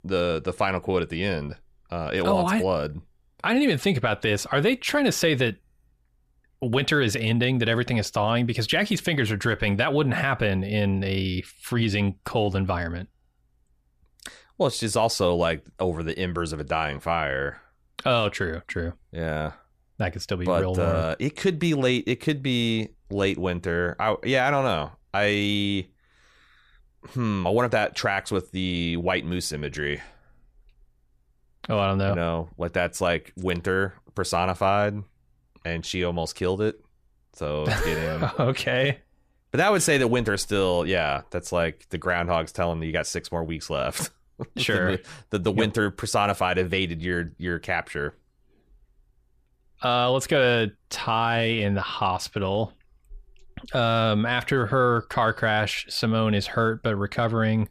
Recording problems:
none

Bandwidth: 14.5 kHz